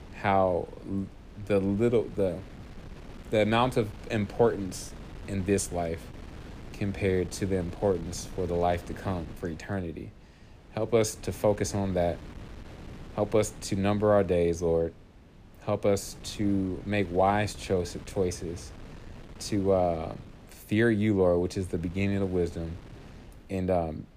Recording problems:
wind noise on the microphone; occasional gusts; 20 dB below the speech

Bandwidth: 15 kHz